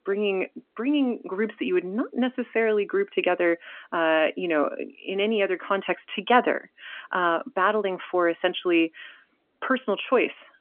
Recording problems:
phone-call audio; nothing above 3 kHz

